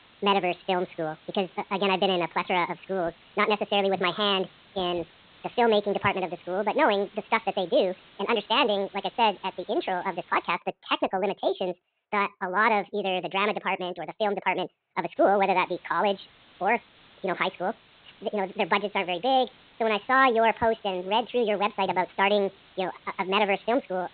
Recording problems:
high frequencies cut off; severe; nothing above 4 kHz
wrong speed and pitch; too fast and too high; 1.6 times normal speed
hiss; faint; until 11 s and from 15 s on; 25 dB below the speech

